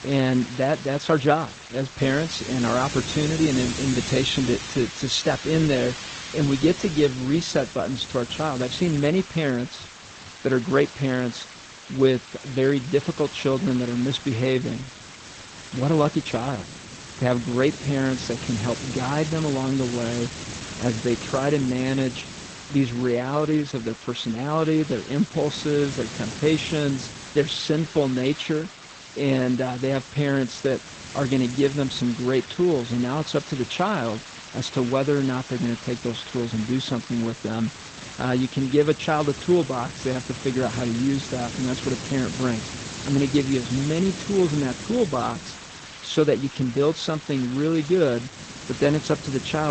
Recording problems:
garbled, watery; slightly; nothing above 7.5 kHz
hiss; noticeable; throughout; 10 dB below the speech
abrupt cut into speech; at the end

